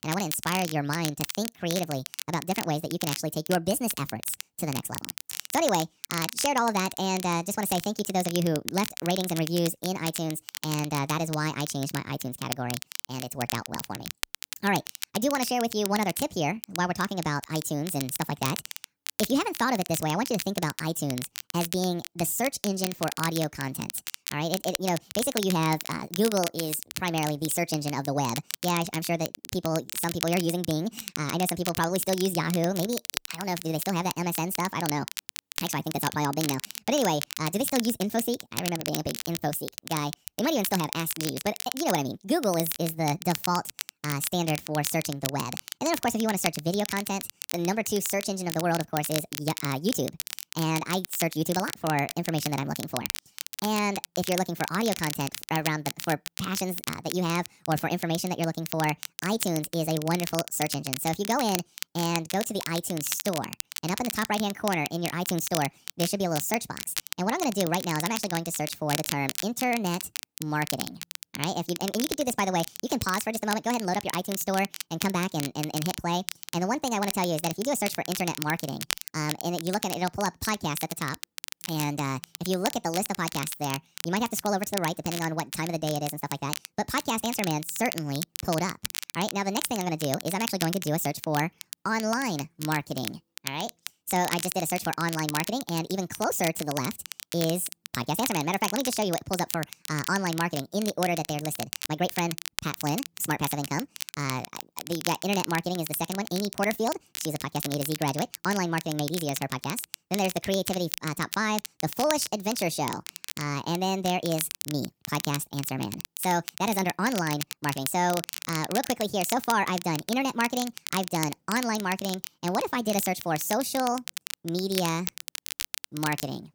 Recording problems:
wrong speed and pitch; too fast and too high; 1.6 times normal speed
crackle, like an old record; loud; 7 dB below the speech

